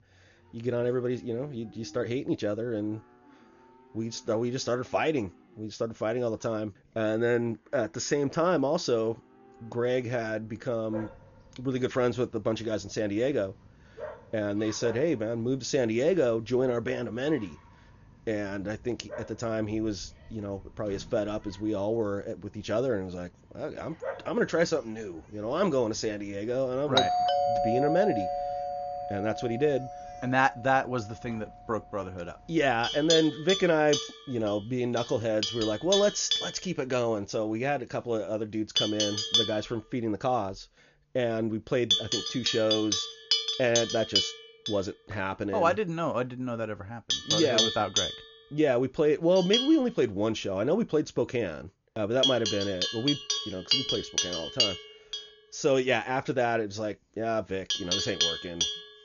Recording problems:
high frequencies cut off; noticeable; nothing above 7 kHz
animal sounds; very loud; throughout; as loud as the speech
doorbell; loud; from 27 to 29 s; peak 4 dB above the speech

